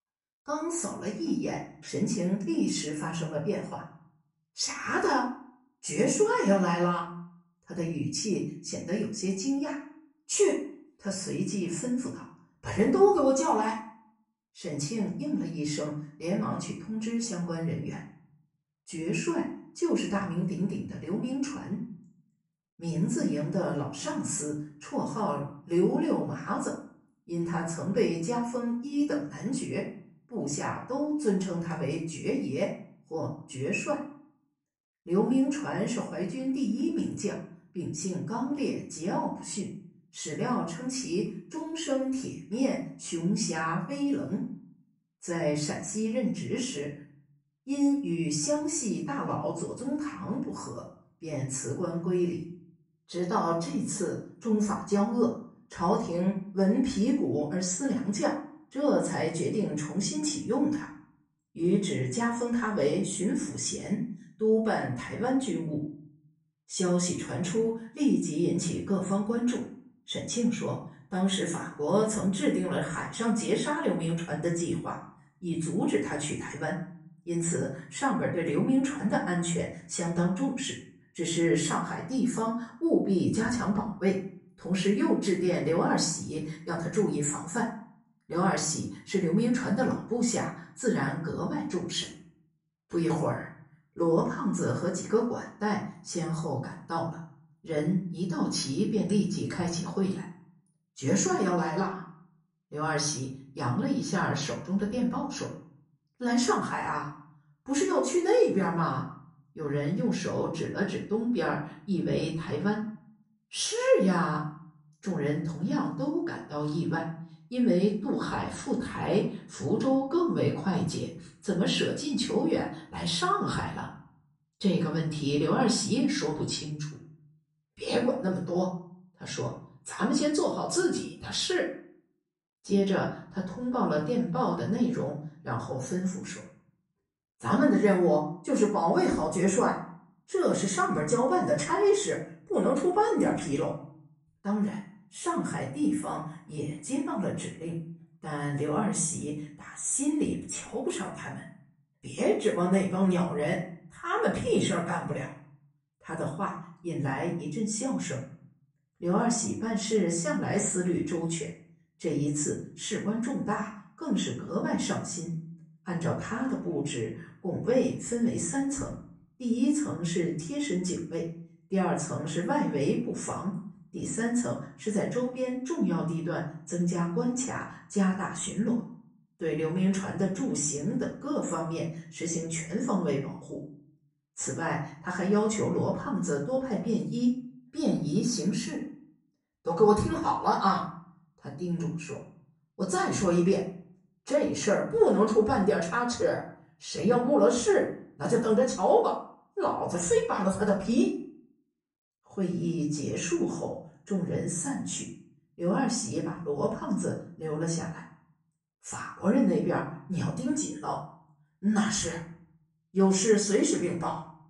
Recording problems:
off-mic speech; far
room echo; slight; dies away in 0.5 s

